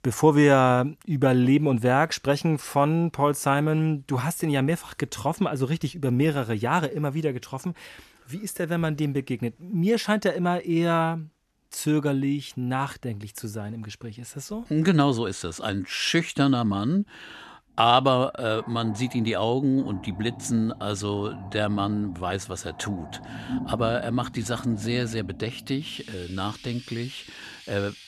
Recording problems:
animal sounds; noticeable; from 18 s on; 15 dB below the speech

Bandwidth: 13.5 kHz